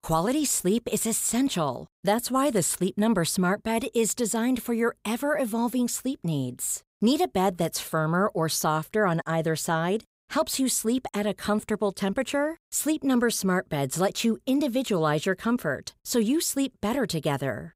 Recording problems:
none

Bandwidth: 15.5 kHz